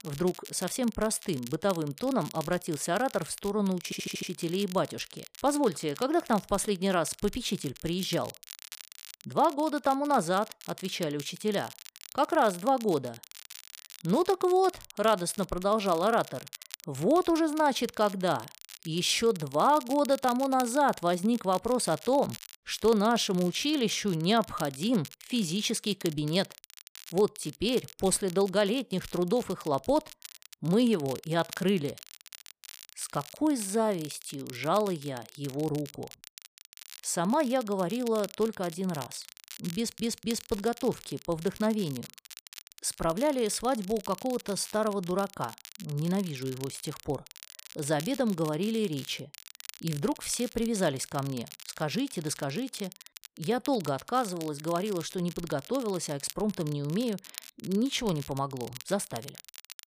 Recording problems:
crackle, like an old record; noticeable; 15 dB below the speech
audio stuttering; at 4 s and at 40 s

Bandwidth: 15 kHz